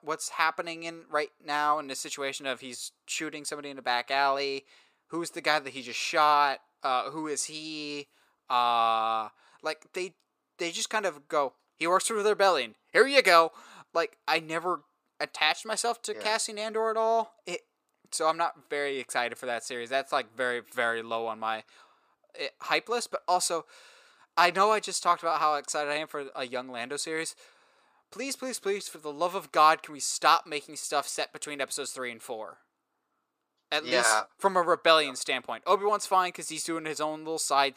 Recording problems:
thin; somewhat; fading below 400 Hz

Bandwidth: 15 kHz